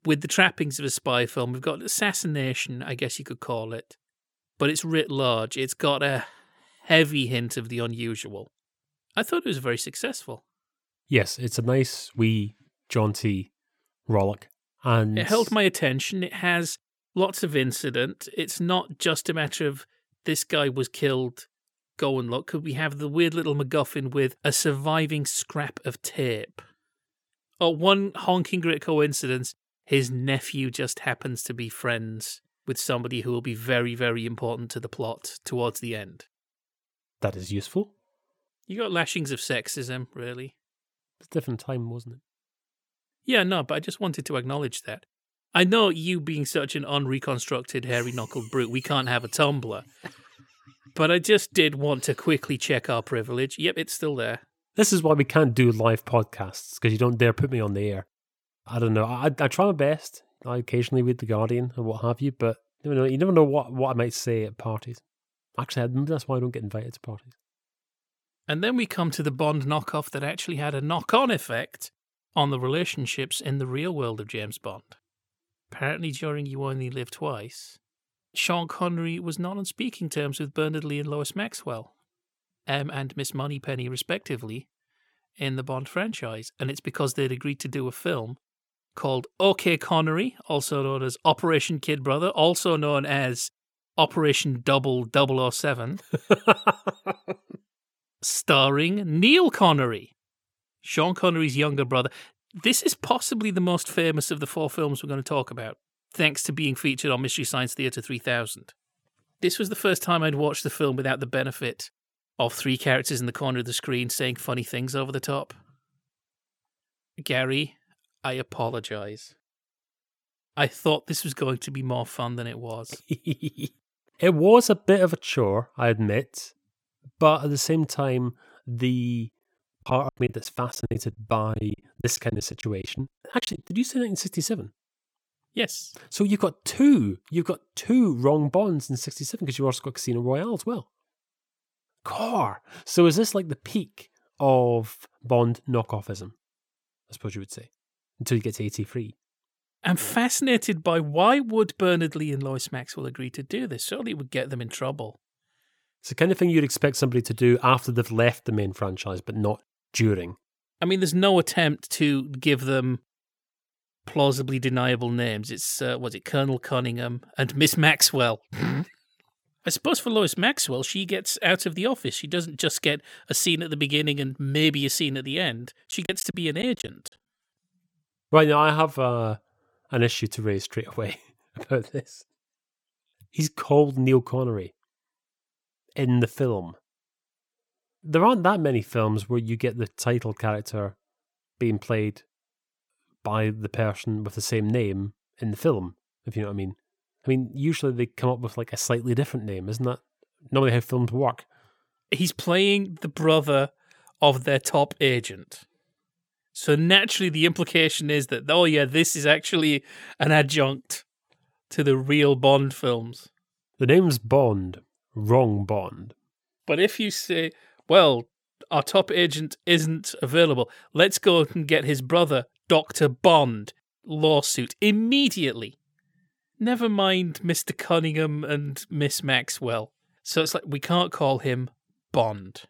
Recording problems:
choppy; very; from 2:10 to 2:14 and from 2:56 to 2:57; 18% of the speech affected

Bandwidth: 18.5 kHz